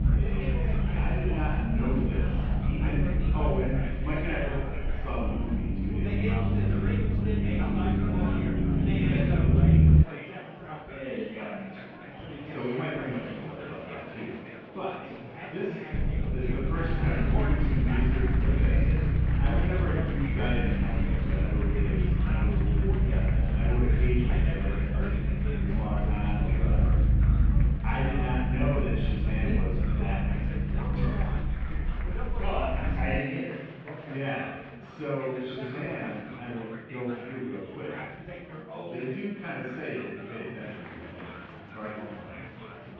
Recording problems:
room echo; strong; dies away in 1.1 s
off-mic speech; far
muffled; very; fading above 3 kHz
murmuring crowd; loud; throughout; 5 dB below the speech
low rumble; loud; until 10 s and from 16 to 33 s; 2 dB below the speech

